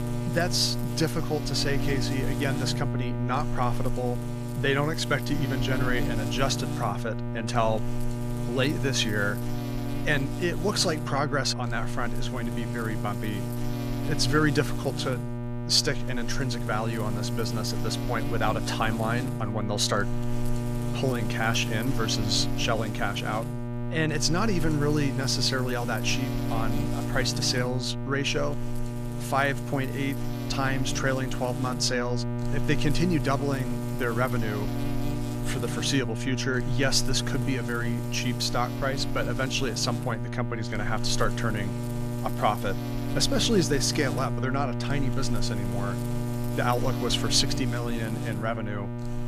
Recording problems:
electrical hum; loud; throughout; 60 Hz, 8 dB below the speech

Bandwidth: 14.5 kHz